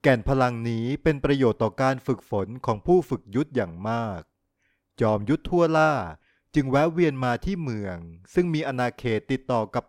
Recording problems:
none

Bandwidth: 16.5 kHz